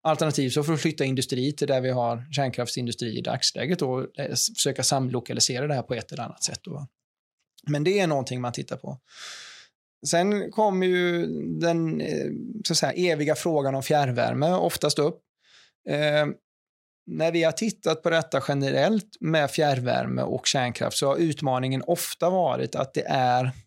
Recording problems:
none

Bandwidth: 16 kHz